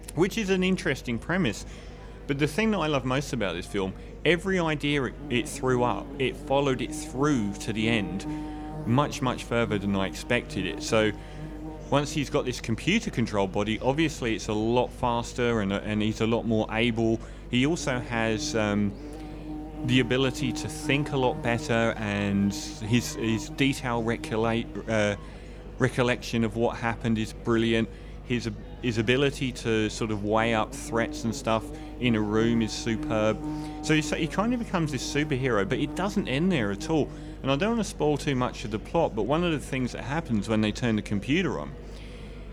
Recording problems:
electrical hum; noticeable; throughout; 50 Hz, 15 dB below the speech
murmuring crowd; faint; throughout; 25 dB below the speech

